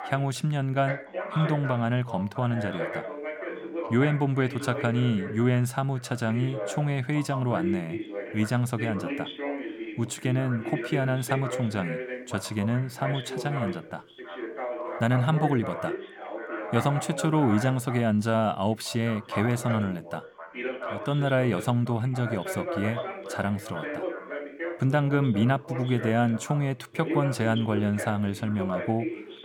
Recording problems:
background chatter; loud; throughout; 2 voices, 8 dB below the speech

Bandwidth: 17.5 kHz